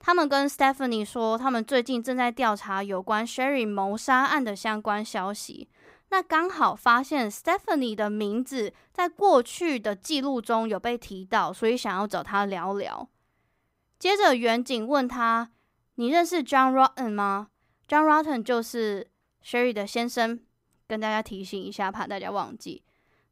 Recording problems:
none

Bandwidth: 15.5 kHz